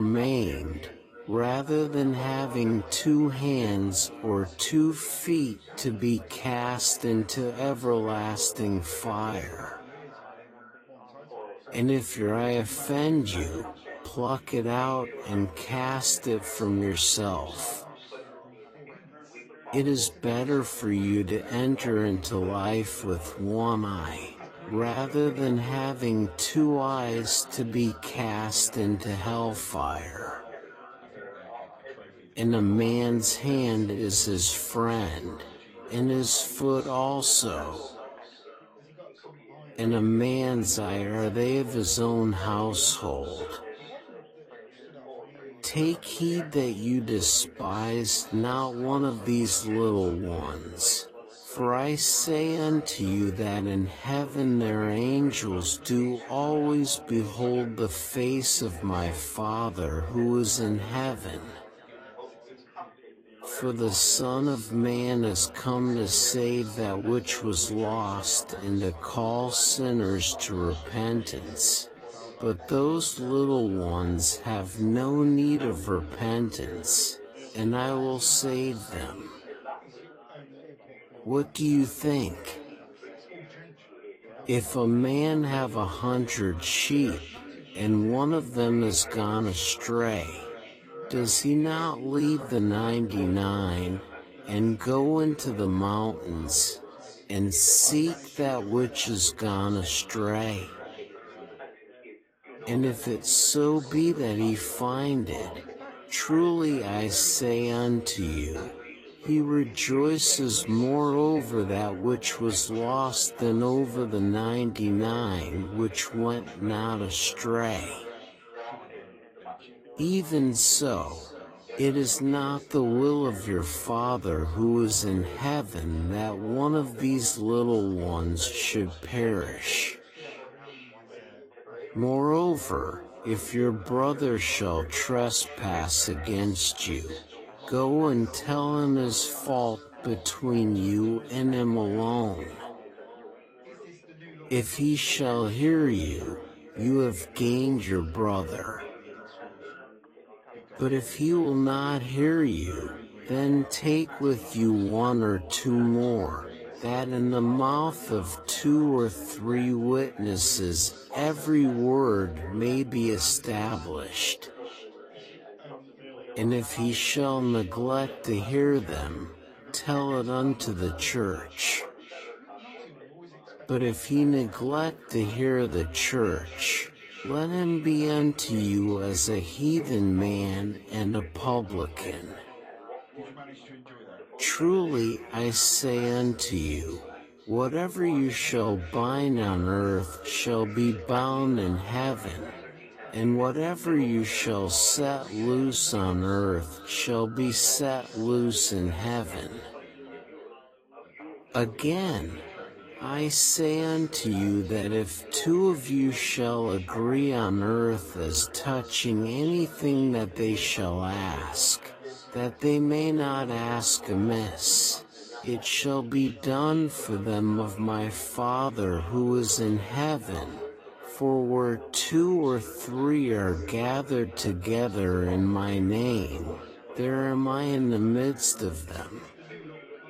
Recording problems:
wrong speed, natural pitch; too slow; 0.5 times normal speed
echo of what is said; faint; throughout; 490 ms later, 20 dB below the speech
garbled, watery; slightly; nothing above 14.5 kHz
background chatter; noticeable; throughout; 4 voices, 20 dB below the speech
abrupt cut into speech; at the start

